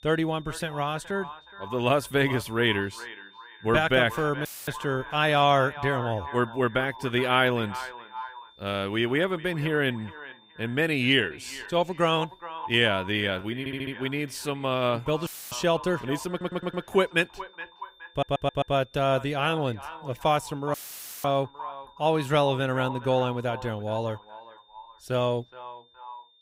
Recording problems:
echo of what is said; noticeable; throughout; 420 ms later, 15 dB below the speech
high-pitched whine; faint; throughout; 3.5 kHz, 30 dB below the speech
audio cutting out; filled with static; at 4.5 s, at 15 s and at 21 s for 0.5 s
audio stuttering; at 14 s, at 16 s and at 18 s

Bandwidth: 15.5 kHz